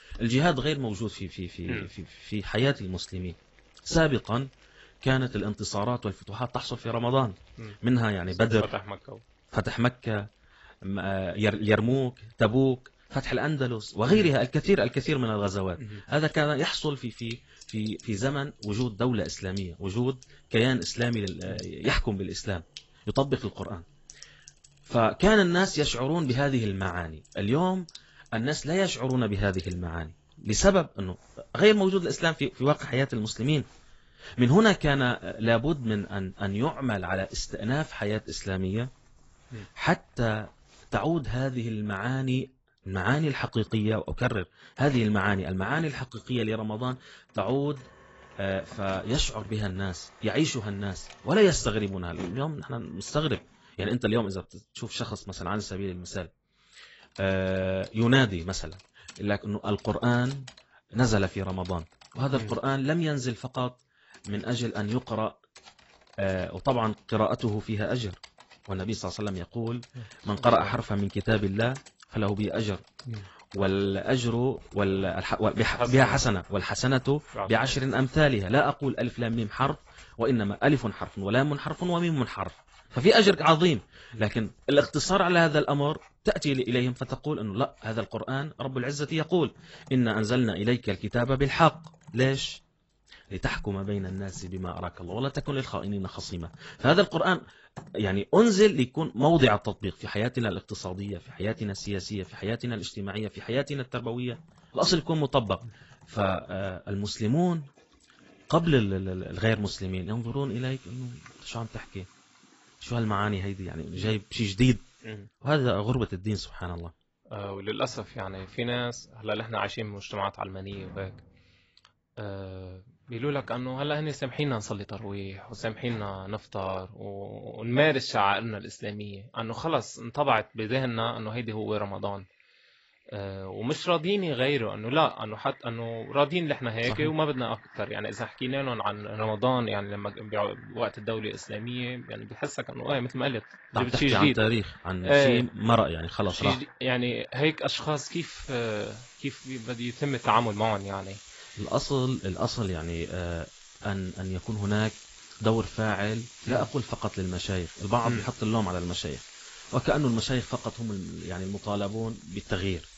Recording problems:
garbled, watery; badly; nothing above 7.5 kHz
household noises; faint; throughout; 25 dB below the speech

